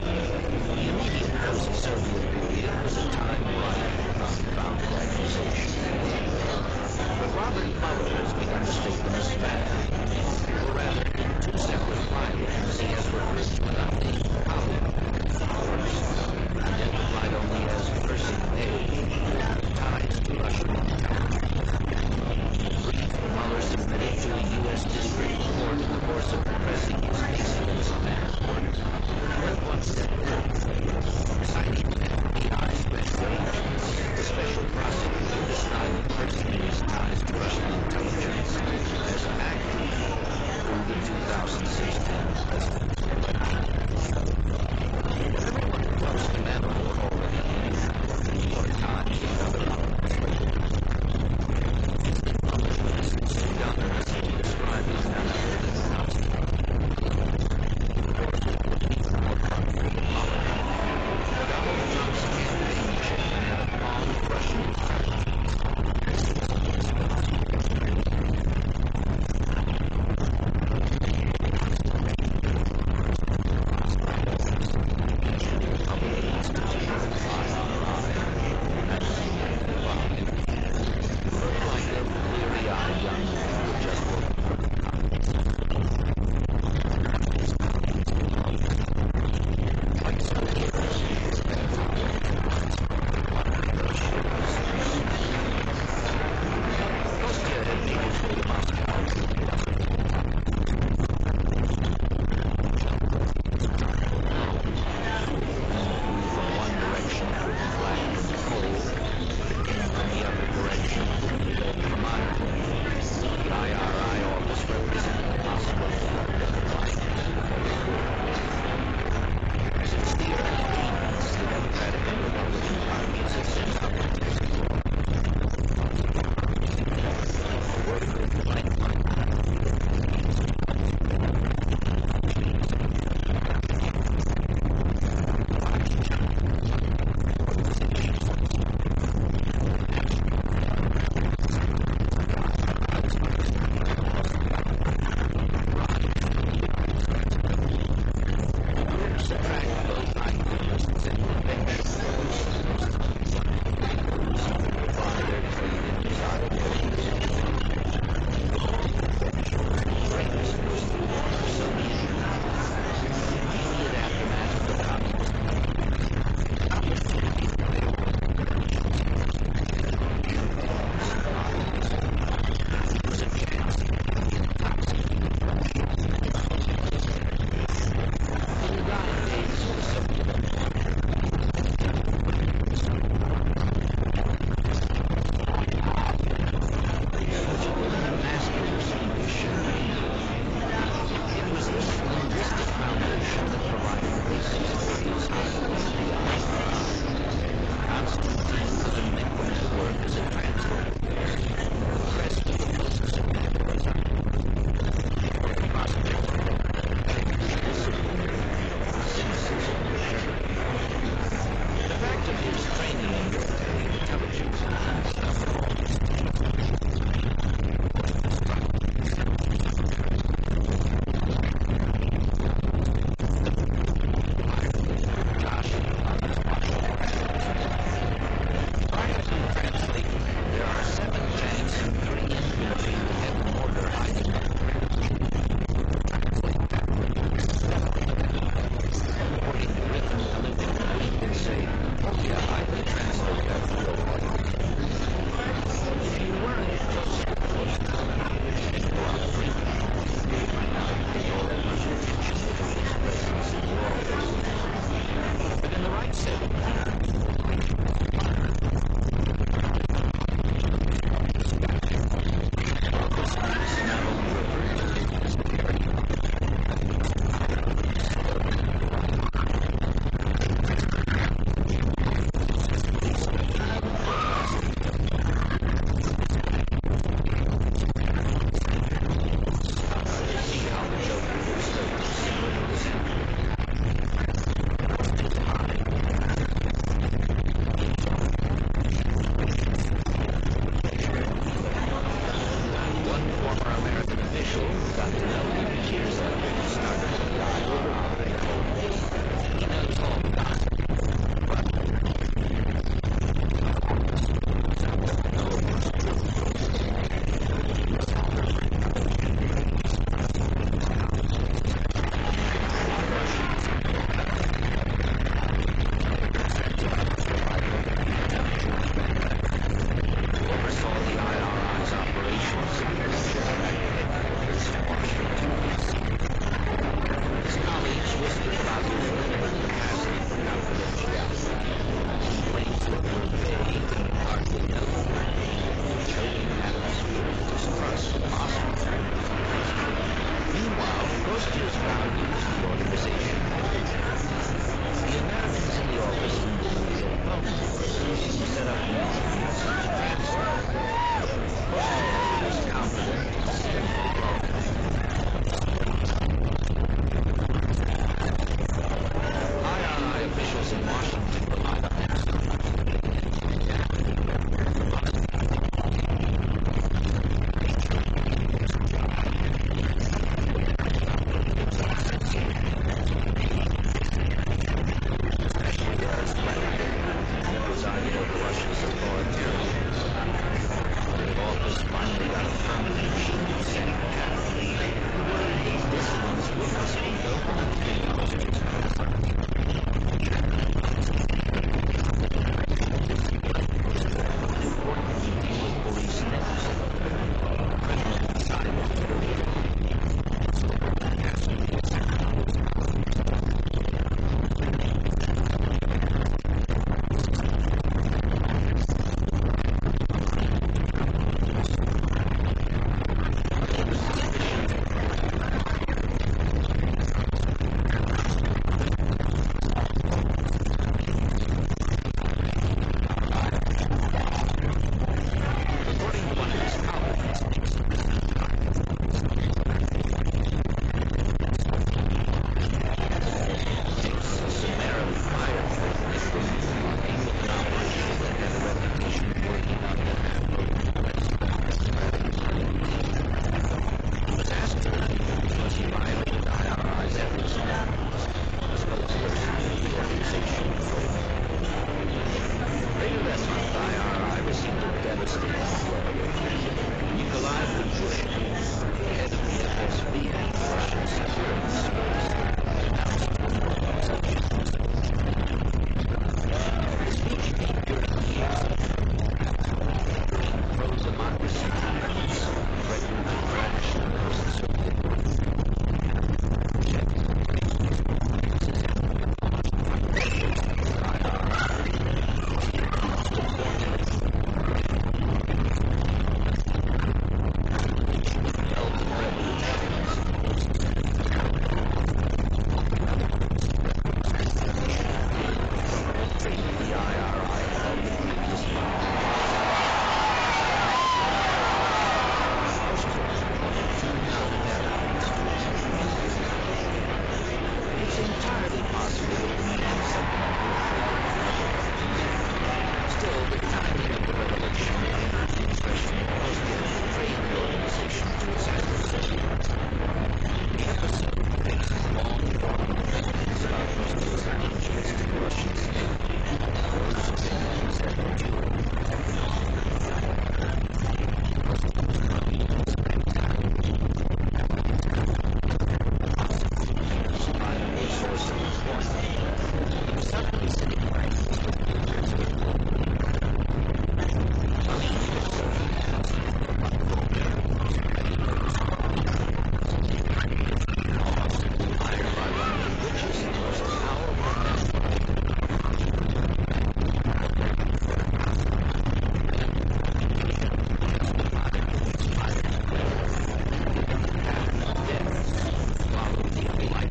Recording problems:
distortion; heavy; 6 dB below the speech
garbled, watery; badly; nothing above 7.5 kHz
murmuring crowd; very loud; throughout; 4 dB above the speech
wind noise on the microphone; heavy; 1 dB below the speech
electrical hum; noticeable; throughout; 50 Hz, 20 dB below the speech
hiss; faint; throughout; 25 dB below the speech

